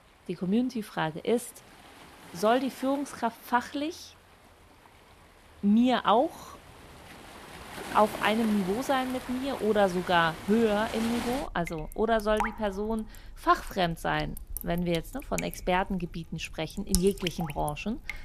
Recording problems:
rain or running water; noticeable; throughout; 10 dB below the speech

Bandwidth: 14.5 kHz